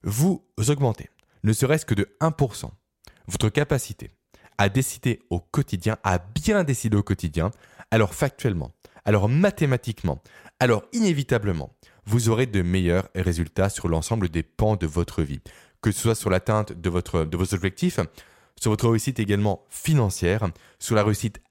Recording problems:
none

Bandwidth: 16 kHz